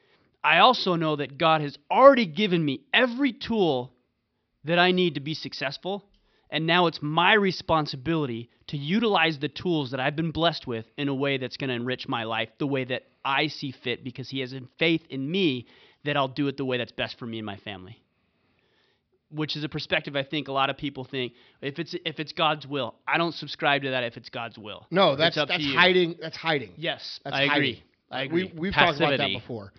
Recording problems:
high frequencies cut off; noticeable; nothing above 5.5 kHz

